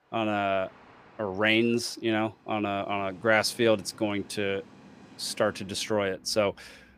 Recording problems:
train or aircraft noise; faint; throughout; 25 dB below the speech

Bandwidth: 15 kHz